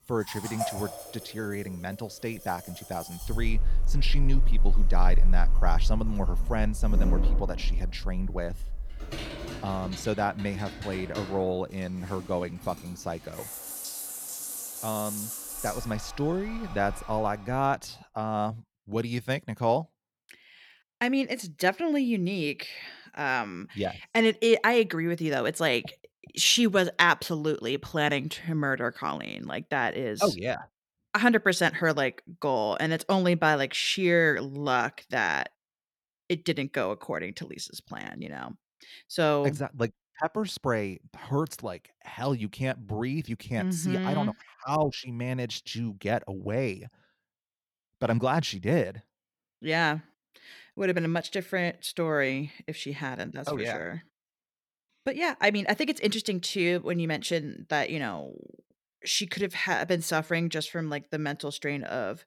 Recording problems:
household noises; loud; until 17 s; 4 dB below the speech

